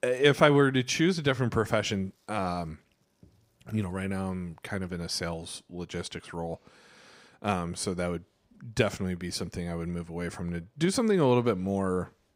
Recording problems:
none

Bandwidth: 15.5 kHz